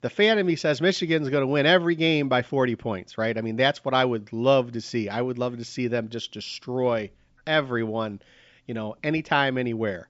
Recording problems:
high frequencies cut off; noticeable; nothing above 8 kHz

